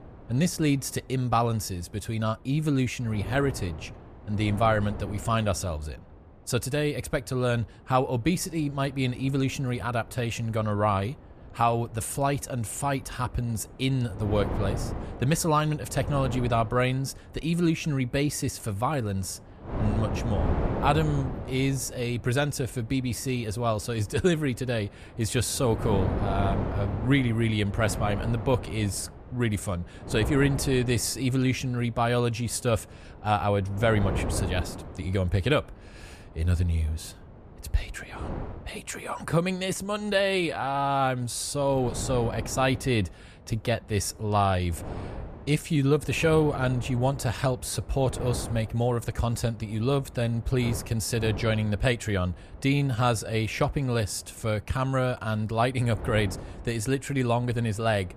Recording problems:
wind noise on the microphone; occasional gusts; 10 dB below the speech

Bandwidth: 14.5 kHz